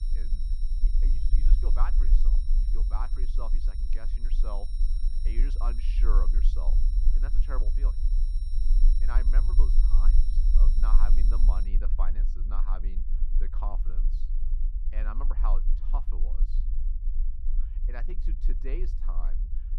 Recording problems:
muffled; slightly; fading above 4 kHz
low rumble; loud; throughout; 10 dB below the speech
high-pitched whine; noticeable; until 12 s; 5.5 kHz, 10 dB below the speech

